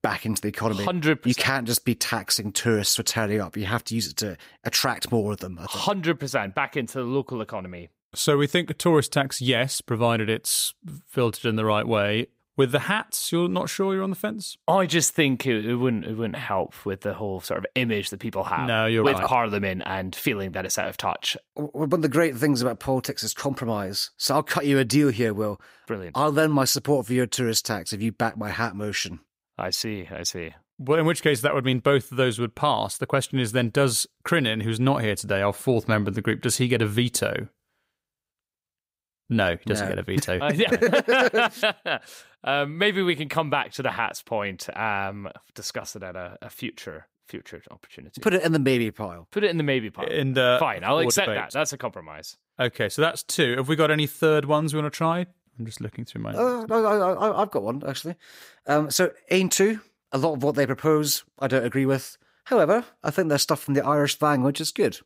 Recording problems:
none

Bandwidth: 15.5 kHz